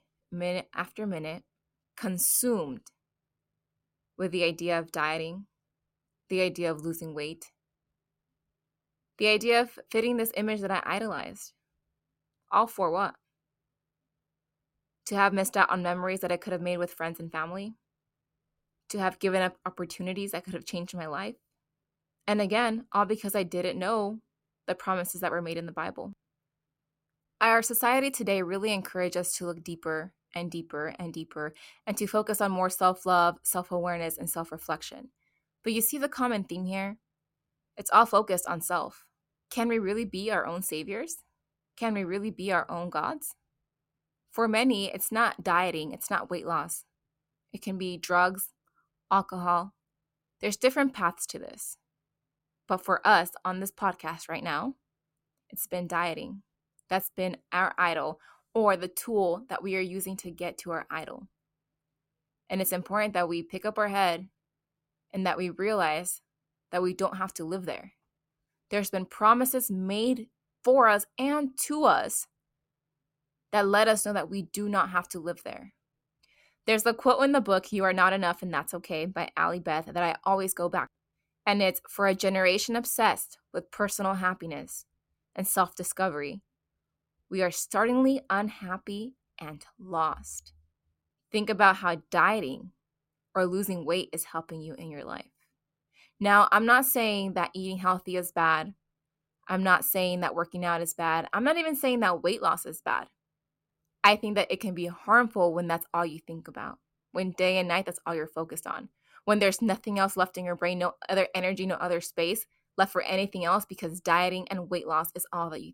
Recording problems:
none

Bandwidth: 16.5 kHz